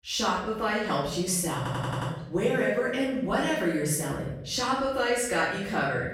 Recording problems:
off-mic speech; far
room echo; noticeable; dies away in 0.9 s
audio stuttering; at 1.5 s

